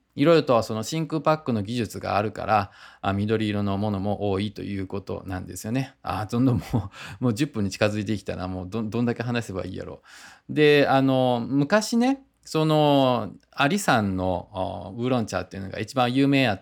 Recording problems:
none

